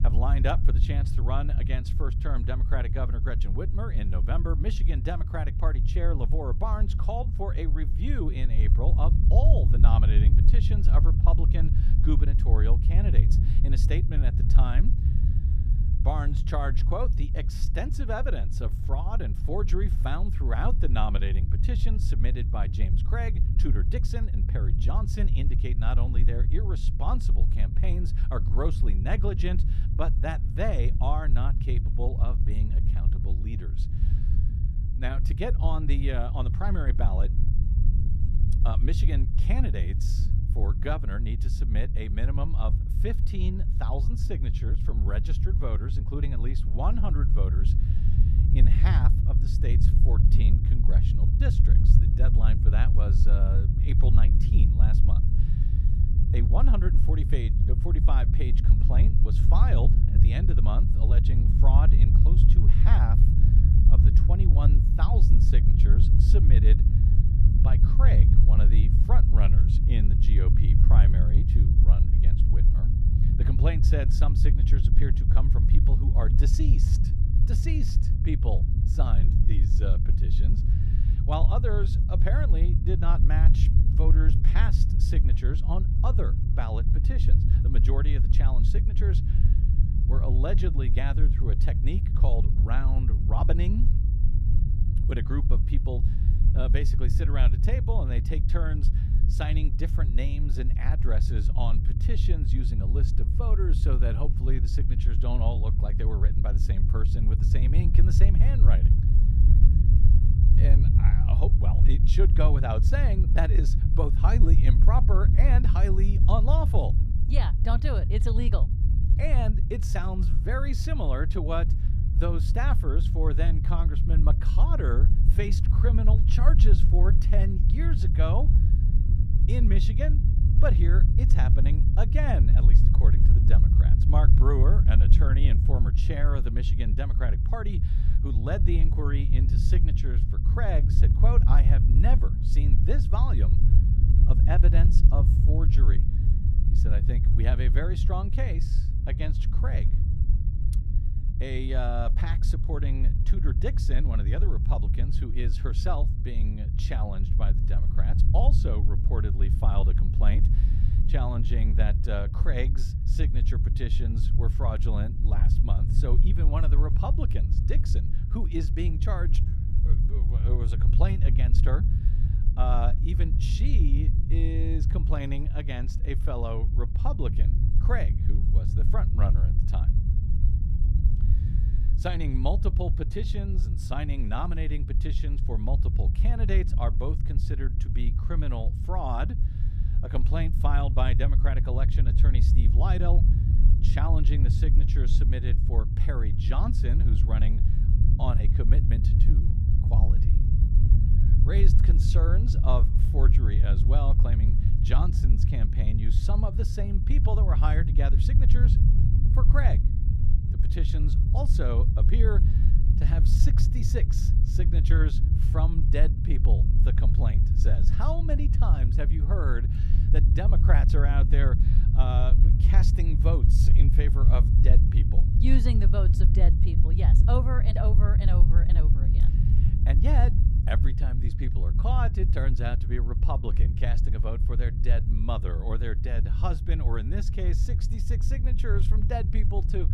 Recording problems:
low rumble; loud; throughout; 4 dB below the speech

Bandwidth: 14.5 kHz